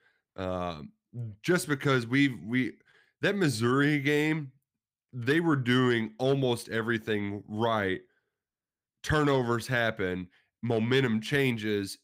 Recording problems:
none

